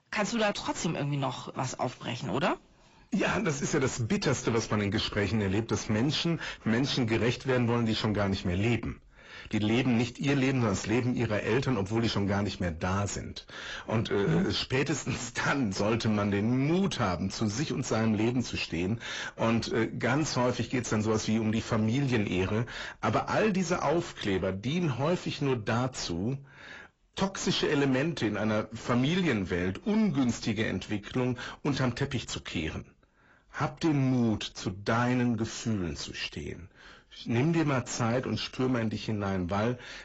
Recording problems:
garbled, watery; badly; nothing above 7.5 kHz
distortion; slight; 10 dB below the speech

